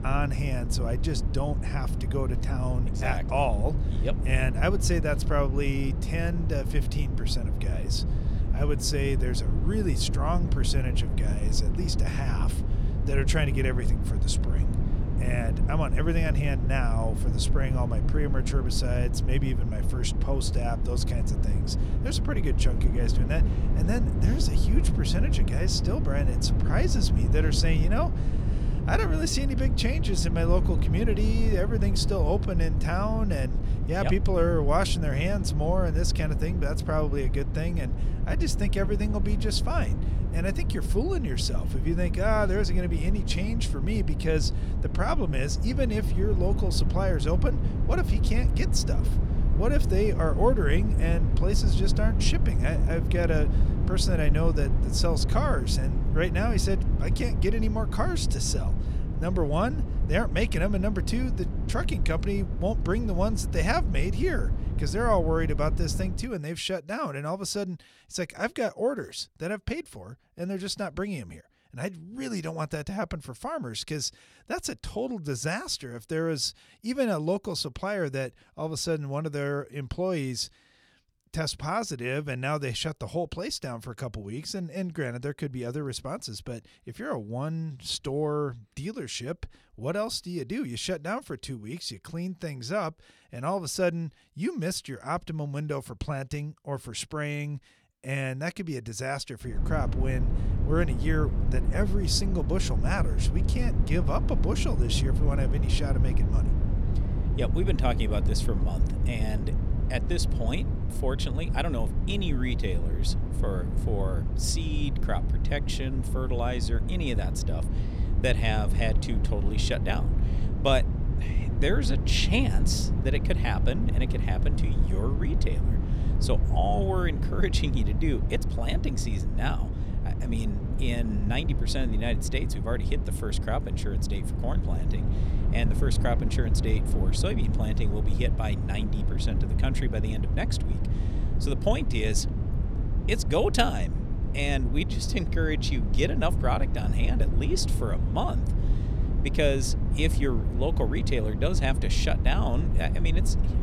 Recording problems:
low rumble; loud; until 1:06 and from 1:40 on; 9 dB below the speech

